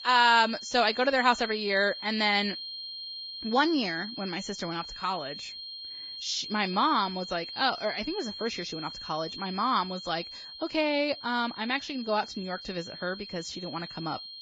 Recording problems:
garbled, watery; badly; nothing above 7.5 kHz
high-pitched whine; loud; throughout; 4 kHz, 10 dB below the speech

